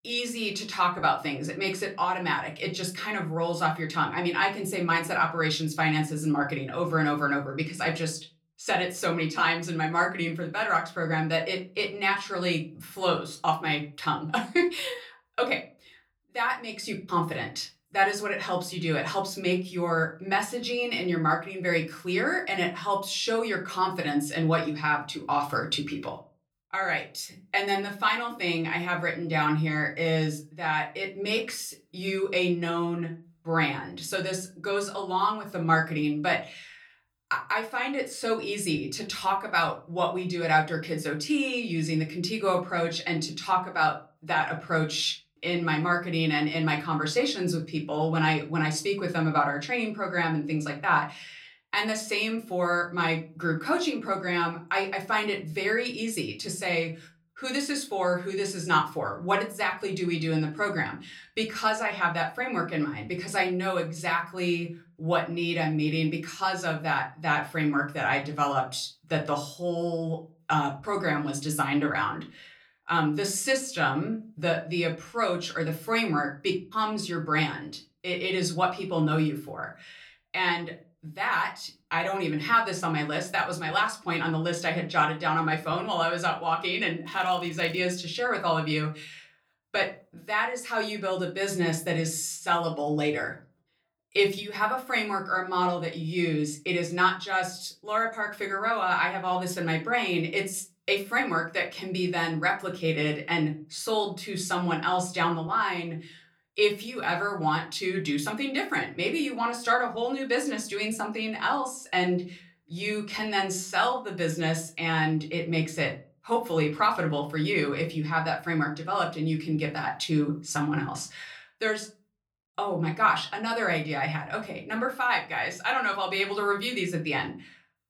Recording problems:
room echo; very slight; dies away in 0.3 s
off-mic speech; somewhat distant
crackling; faint; at 1:27; 25 dB below the speech

